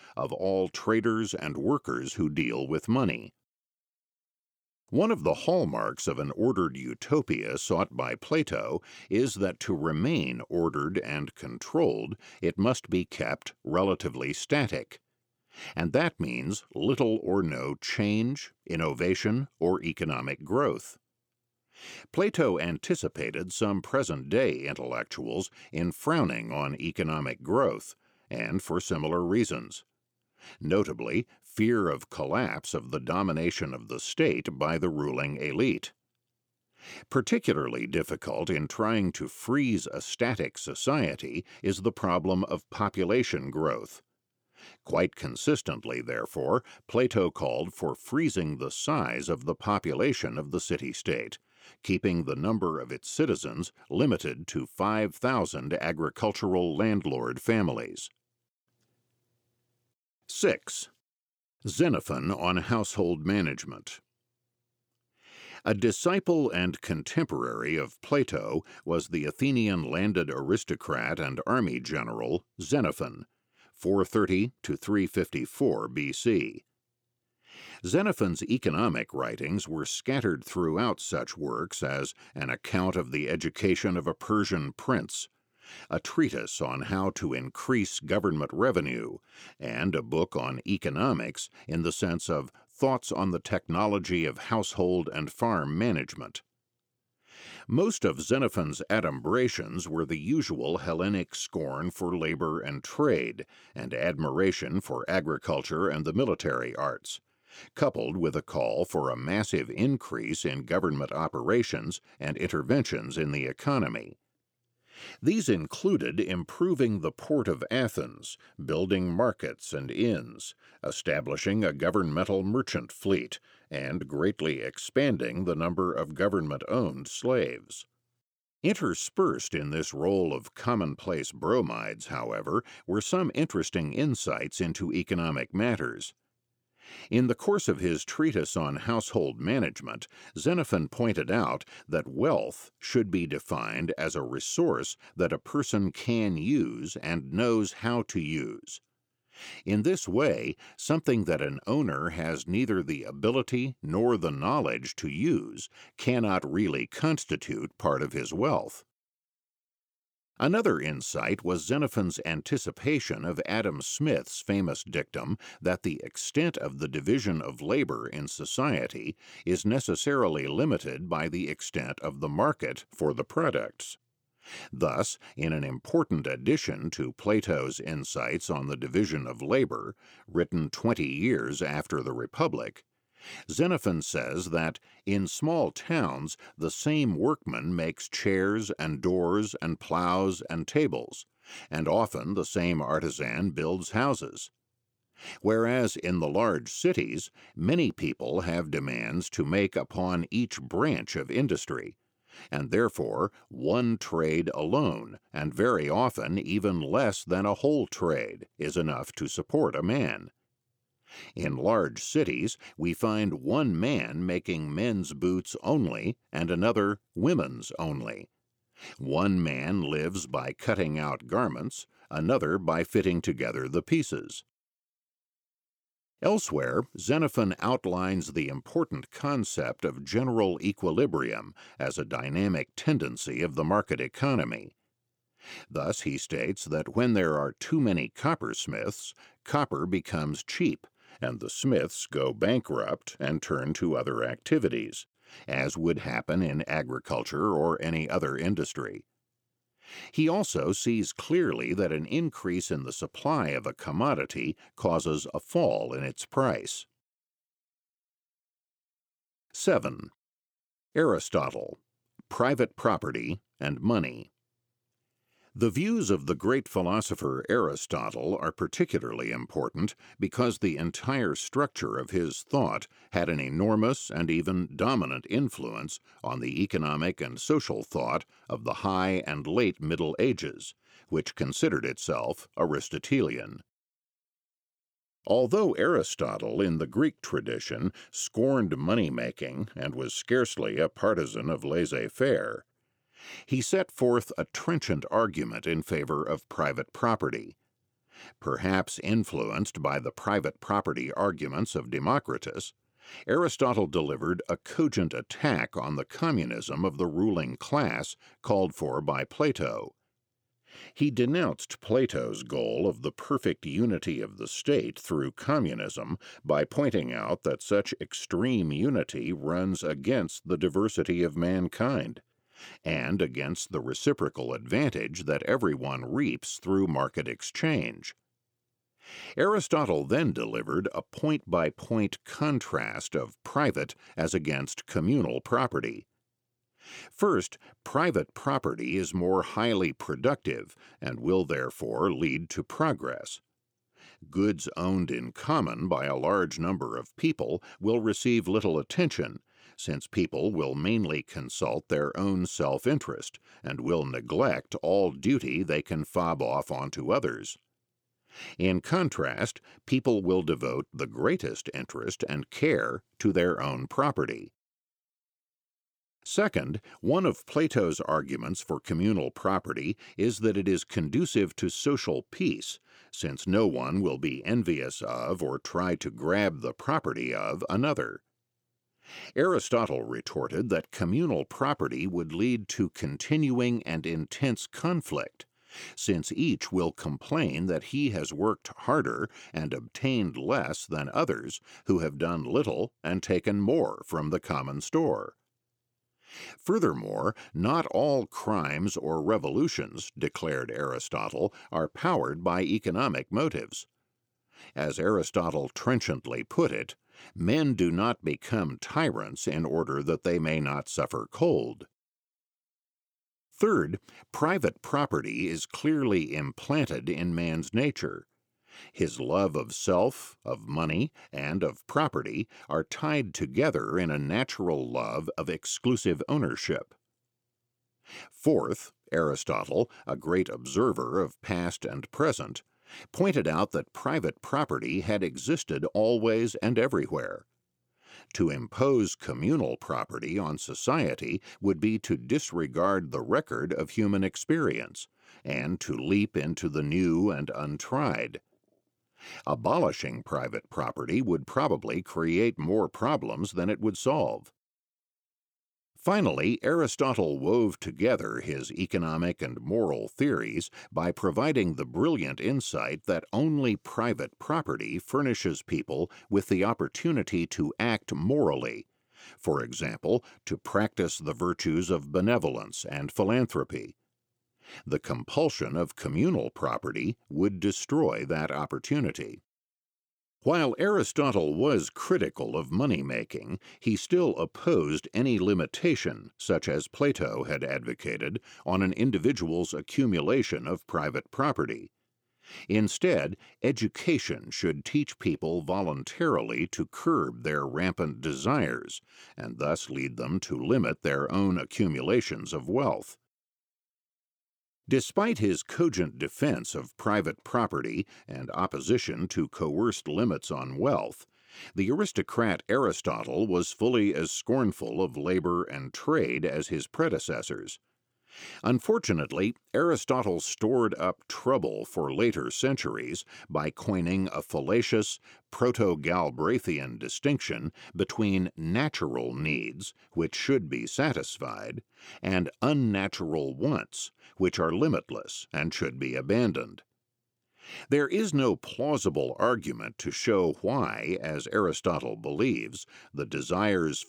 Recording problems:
none

